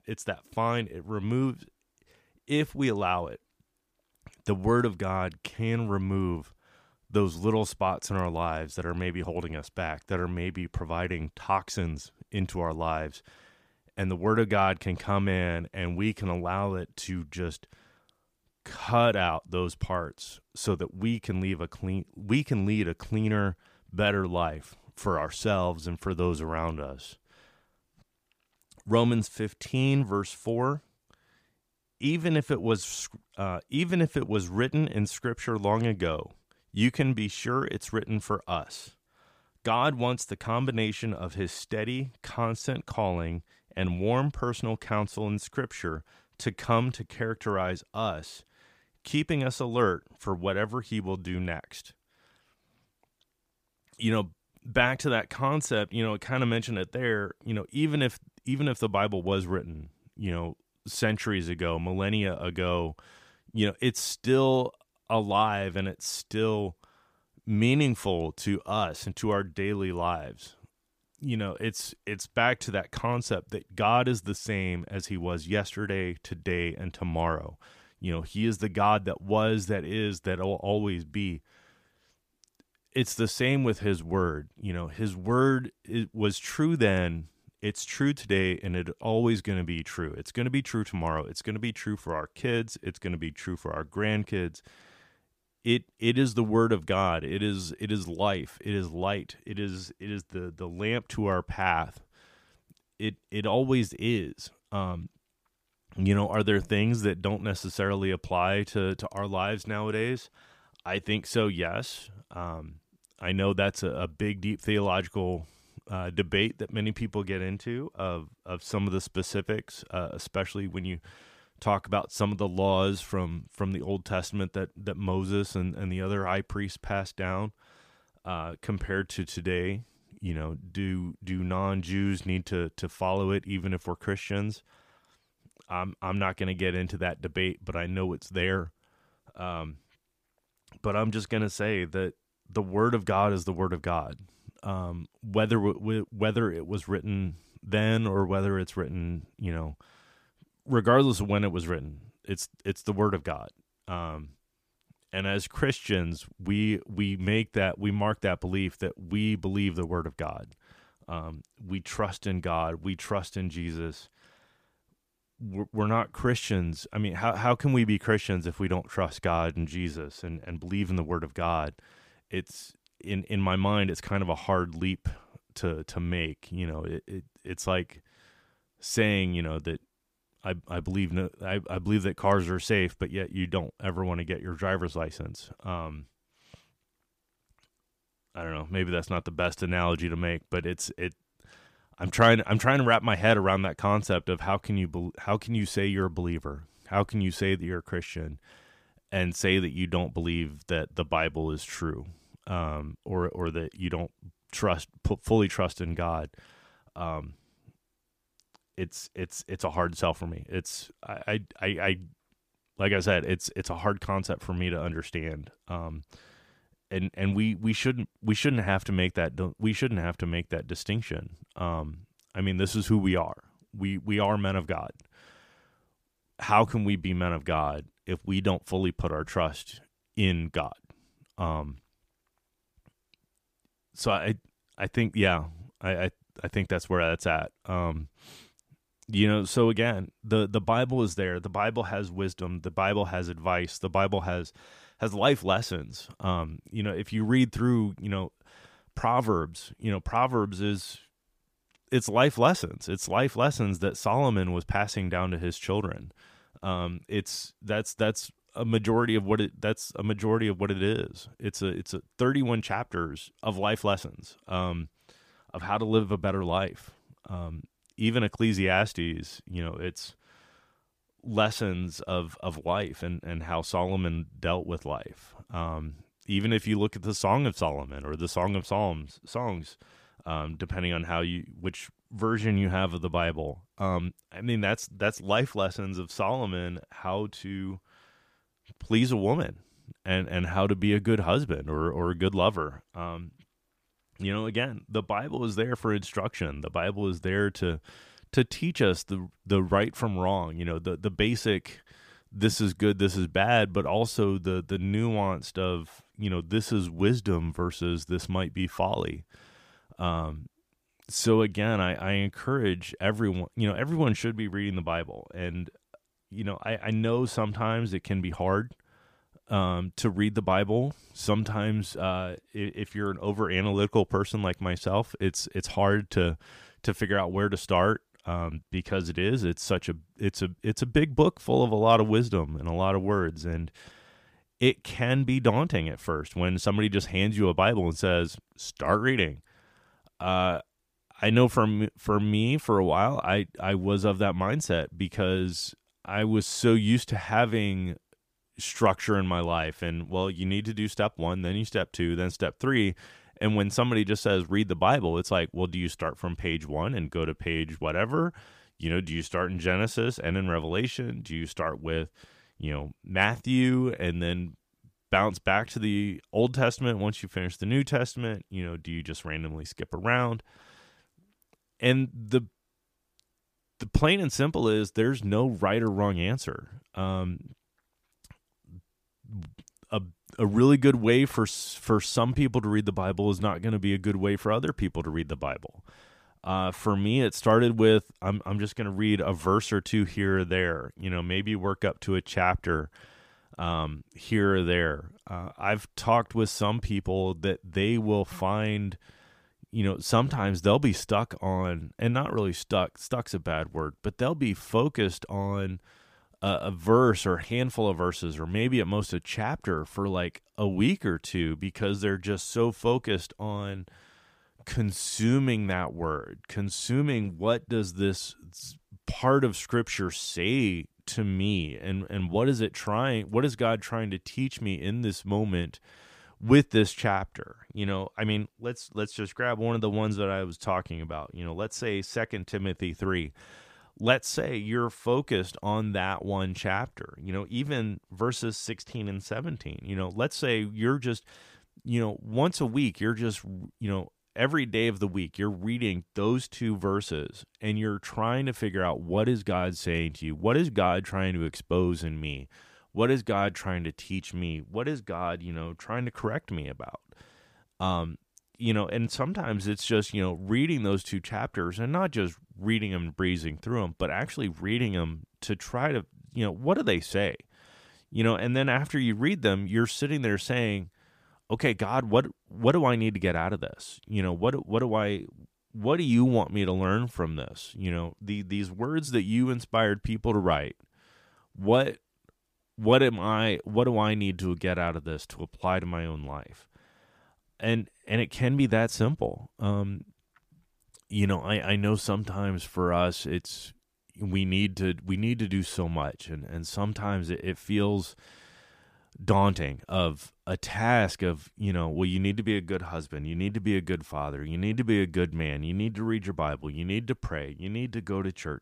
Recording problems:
none

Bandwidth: 15 kHz